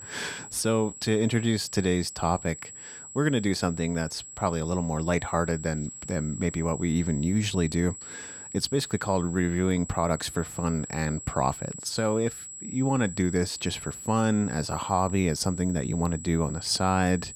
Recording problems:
high-pitched whine; noticeable; throughout; 7.5 kHz, 10 dB below the speech

